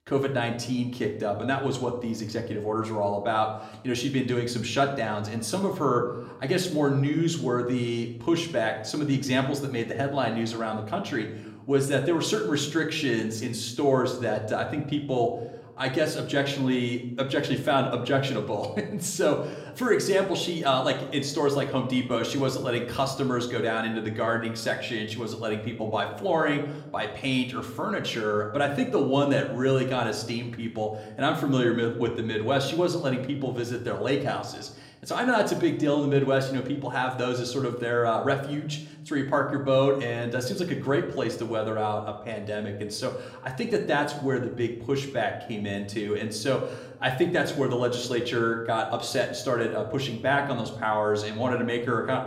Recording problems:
room echo; slight; dies away in 0.7 s
off-mic speech; somewhat distant

